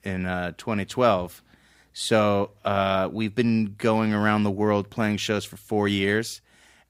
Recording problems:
none

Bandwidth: 15.5 kHz